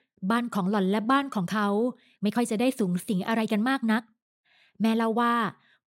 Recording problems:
uneven, jittery; strongly; from 0.5 to 5.5 s

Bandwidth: 16 kHz